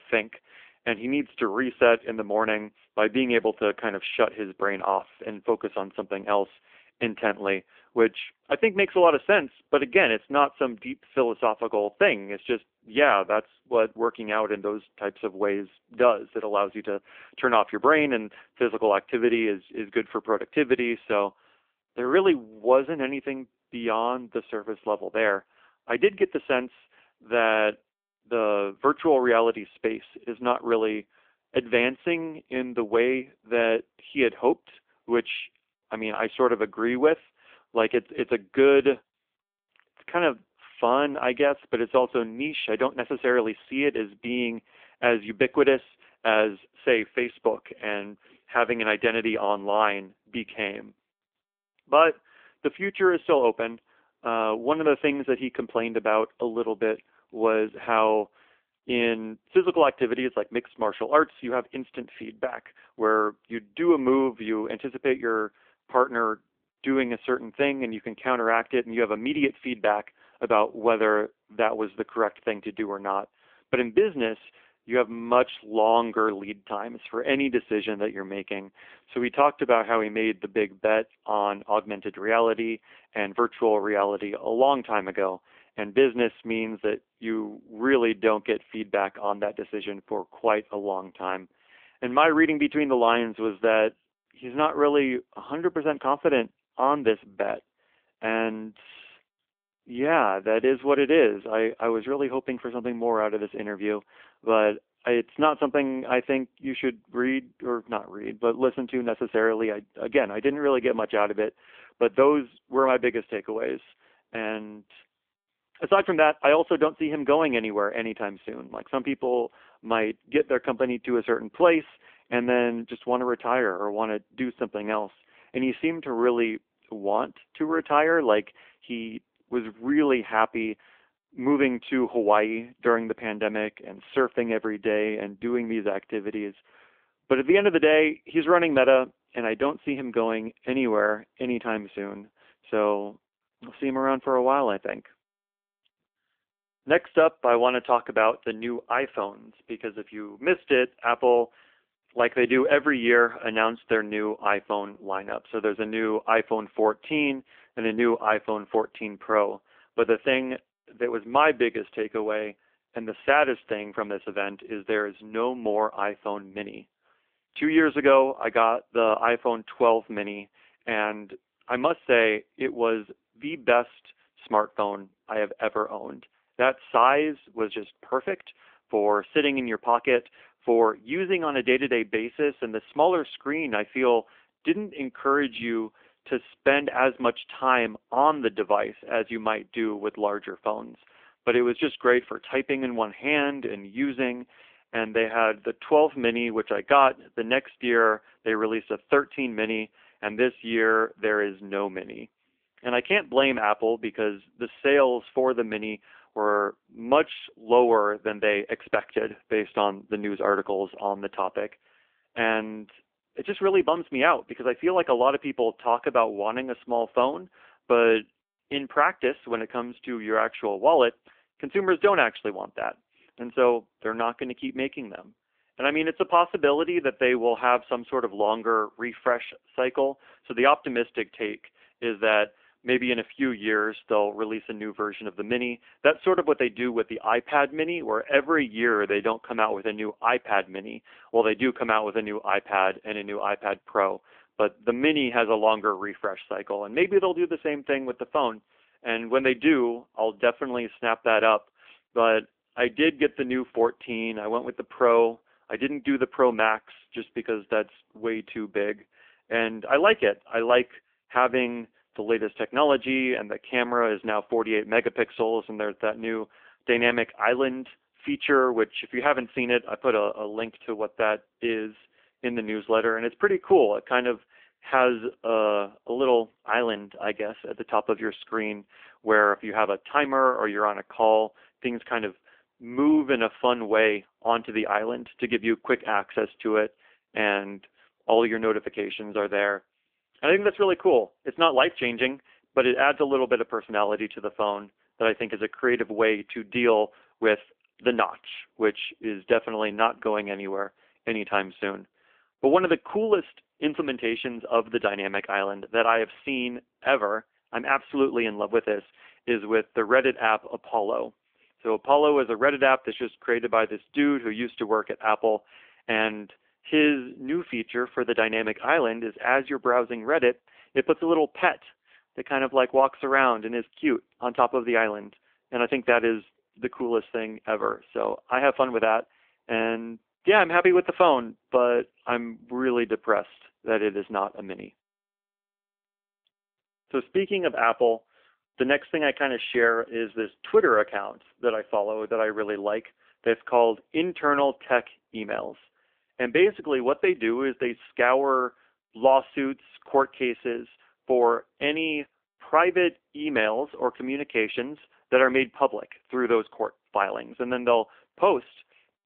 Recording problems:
phone-call audio; nothing above 3 kHz

